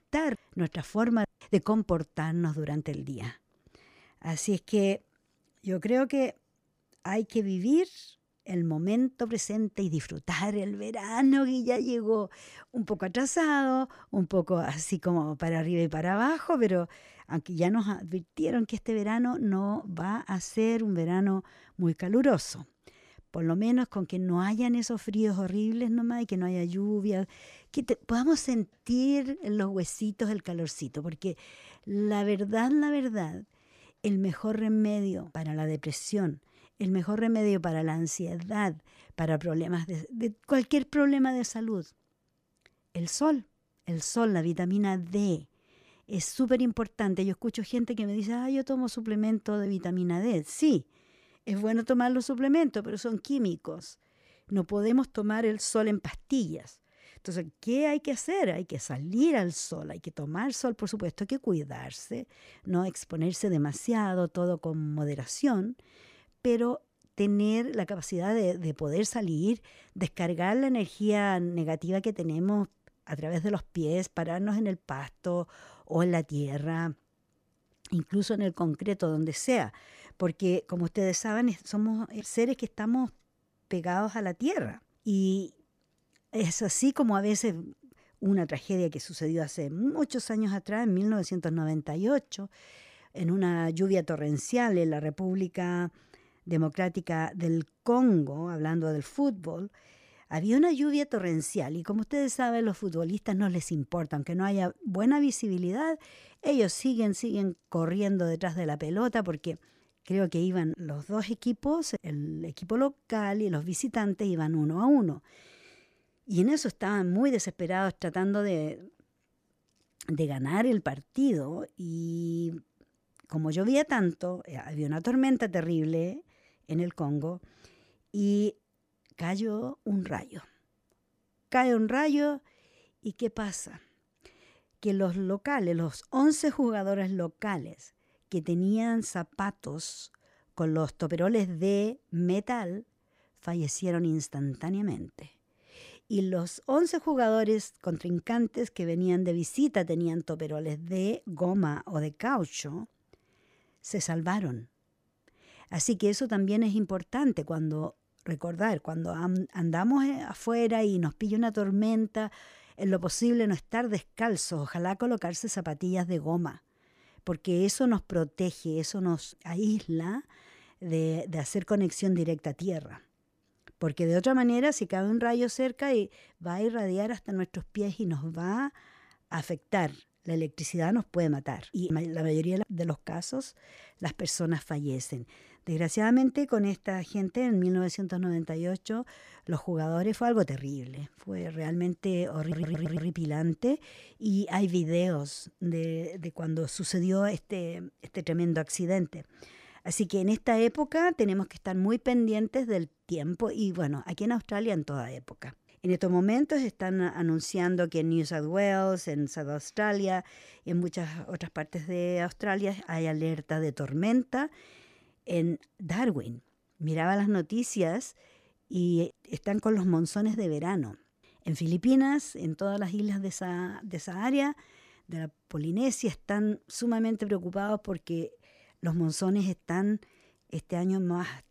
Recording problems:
audio stuttering; at 3:12

